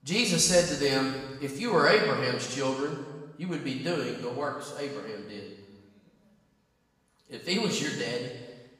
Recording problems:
off-mic speech; far
room echo; noticeable; dies away in 1.2 s

